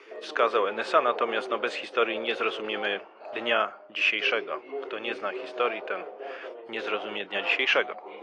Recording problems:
thin; very; fading below 450 Hz
muffled; slightly; fading above 3 kHz
garbled, watery; slightly; nothing above 10 kHz
background chatter; noticeable; throughout; 2 voices, 10 dB below the speech

